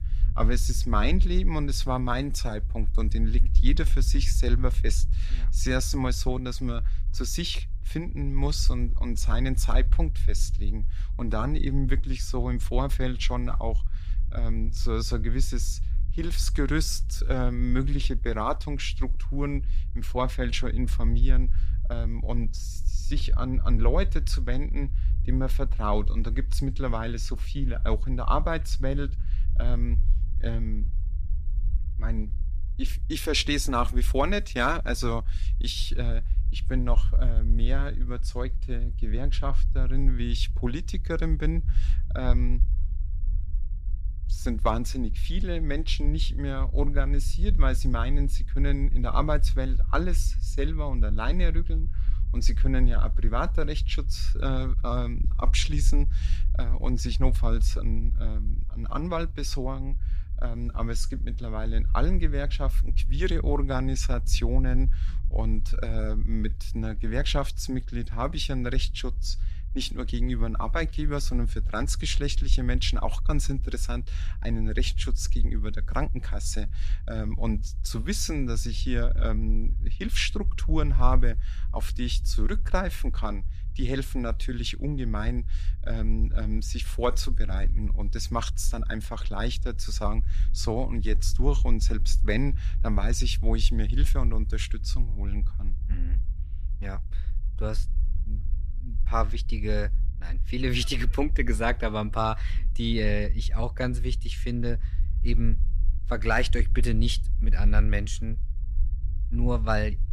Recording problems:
low rumble; noticeable; throughout; 20 dB below the speech

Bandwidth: 14.5 kHz